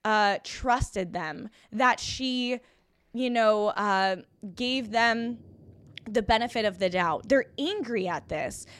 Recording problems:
rain or running water; faint; throughout; 30 dB below the speech

